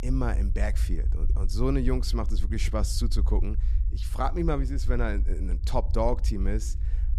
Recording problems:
low rumble; noticeable; throughout; 15 dB below the speech

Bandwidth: 13.5 kHz